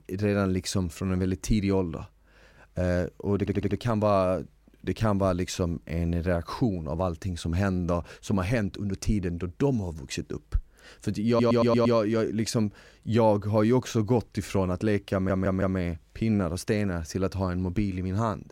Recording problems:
audio stuttering; at 3.5 s, at 11 s and at 15 s

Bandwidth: 16 kHz